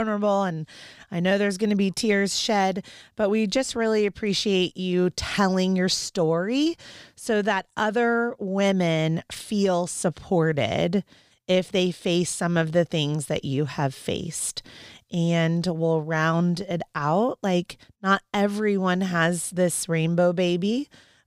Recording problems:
abrupt cut into speech; at the start

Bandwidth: 15 kHz